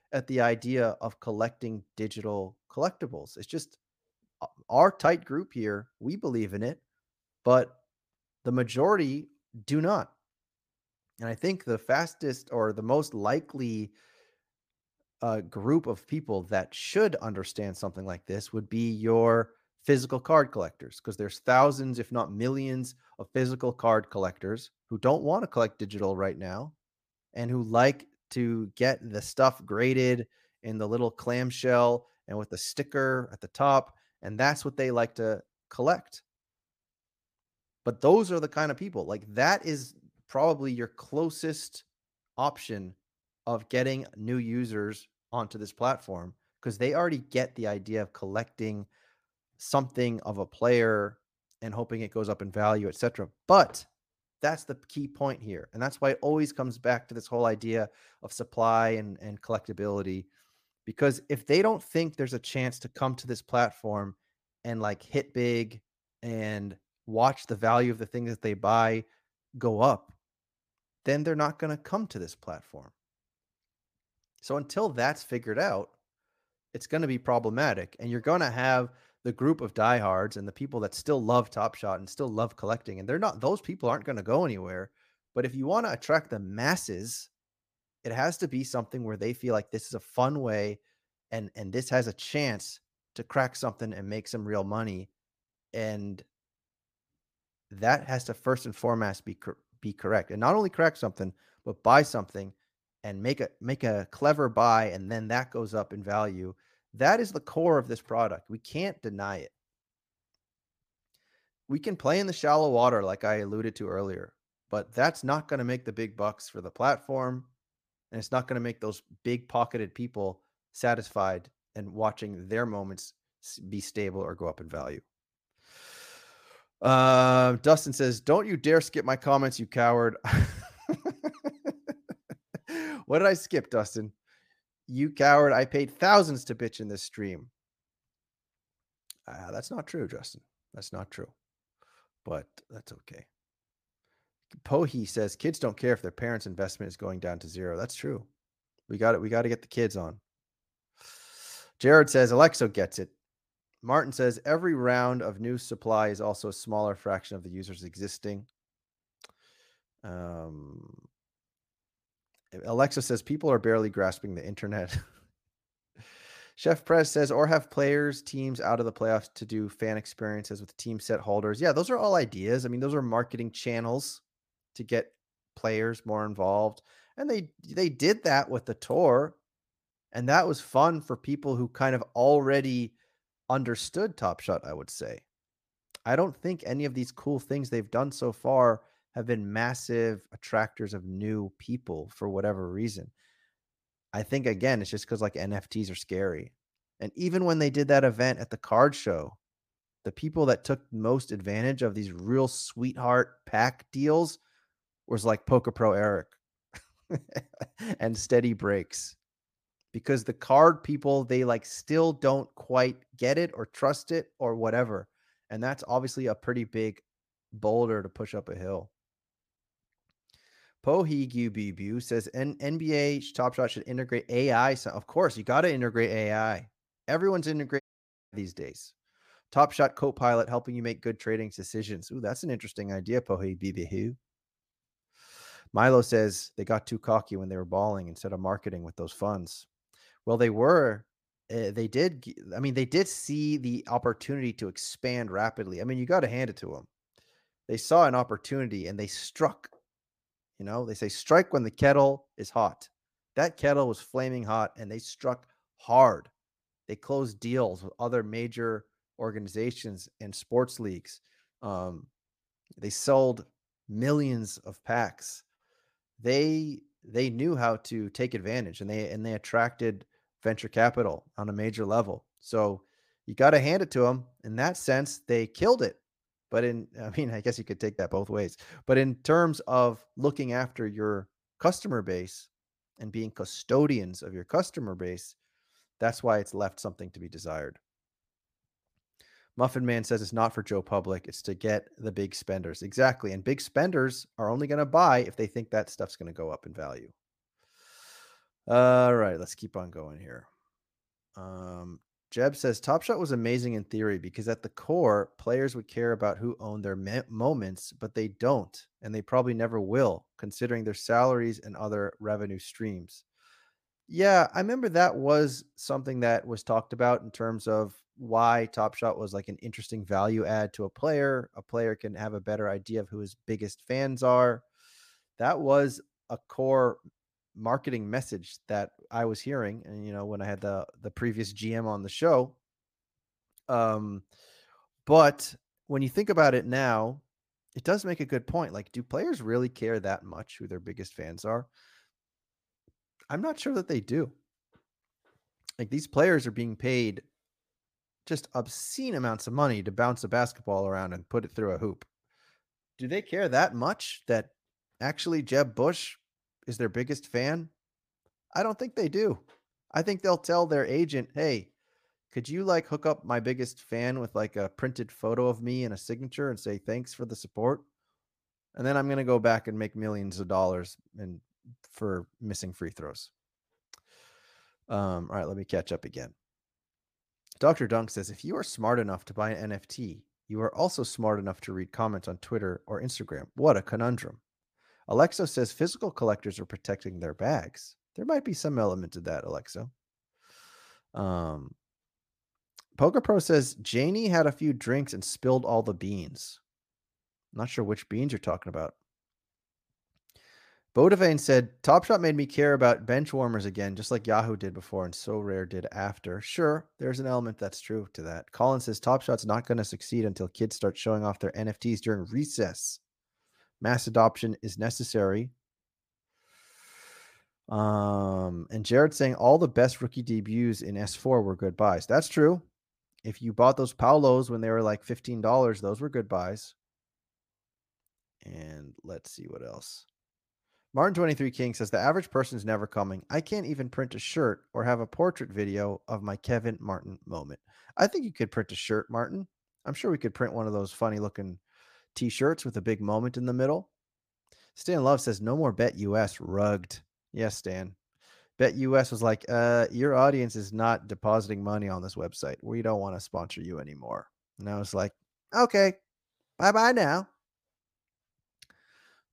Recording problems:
audio cutting out; at 3:48 for 0.5 s

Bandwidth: 15 kHz